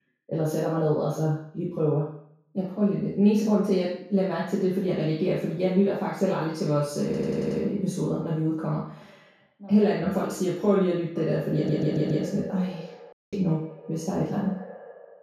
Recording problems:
off-mic speech; far
echo of what is said; noticeable; from 11 s on; 110 ms later, 15 dB below the speech
room echo; noticeable; dies away in 0.6 s
audio stuttering; at 7 s and at 12 s
audio cutting out; at 13 s

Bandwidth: 14.5 kHz